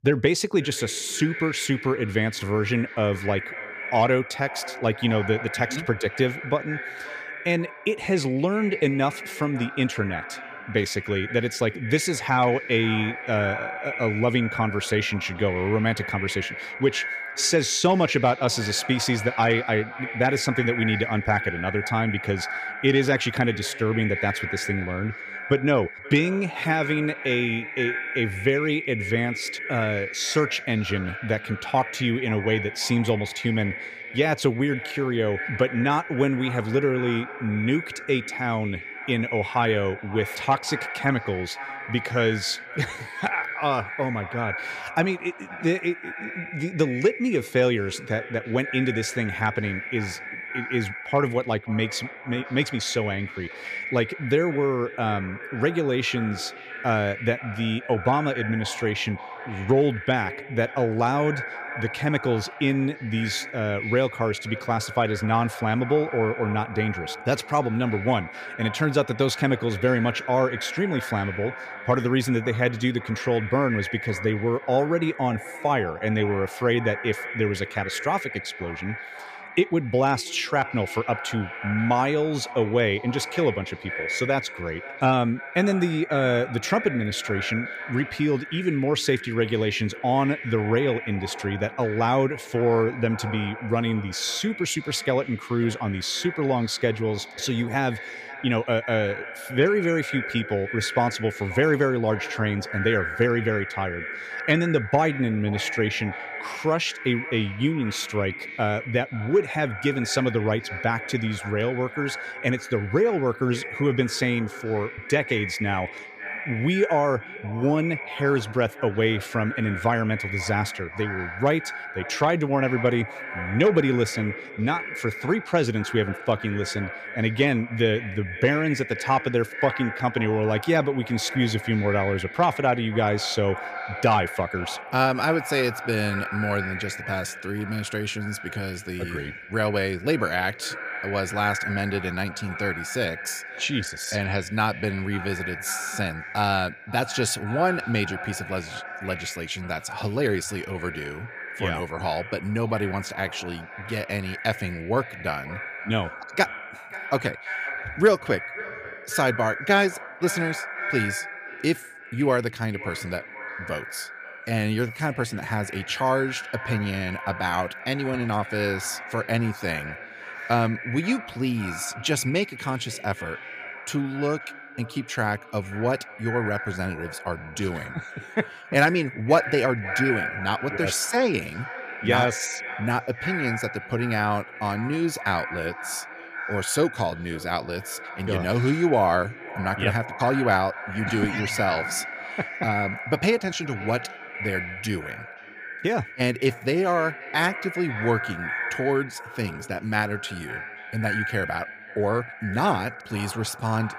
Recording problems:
echo of what is said; strong; throughout; 530 ms later, 9 dB below the speech

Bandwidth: 15 kHz